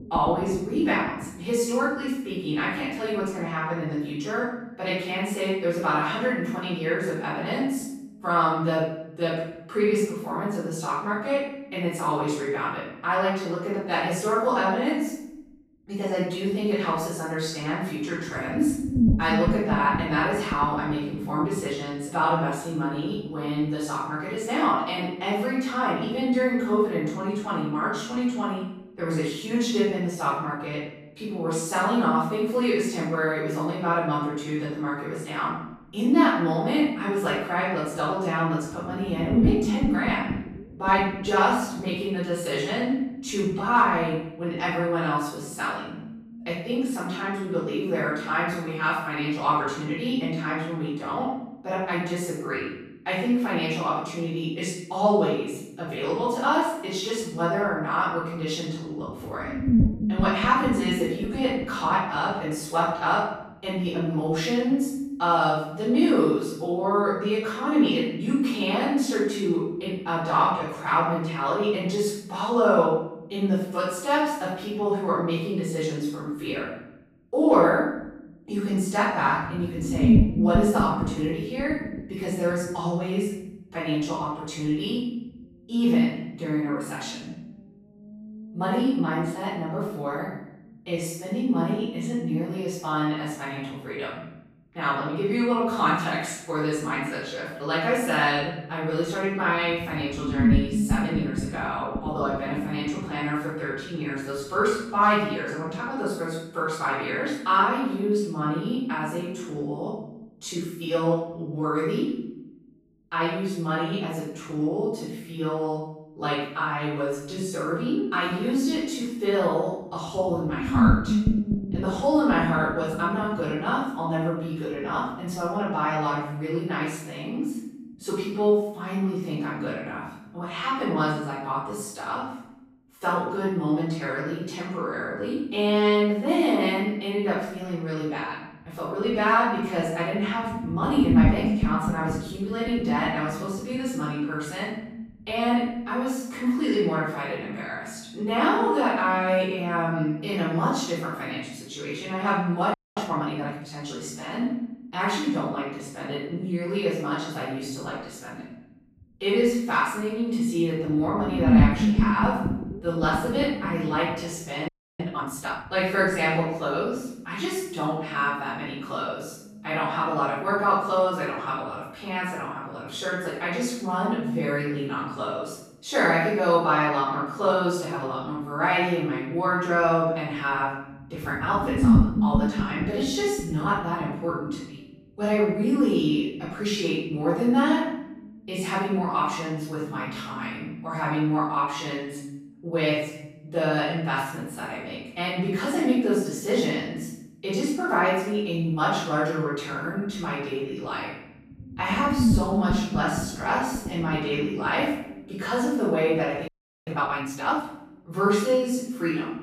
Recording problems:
room echo; strong; dies away in 0.8 s
off-mic speech; far
low rumble; loud; throughout; 9 dB below the speech
audio freezing; at 2:33, at 2:45 and at 3:26

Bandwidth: 15.5 kHz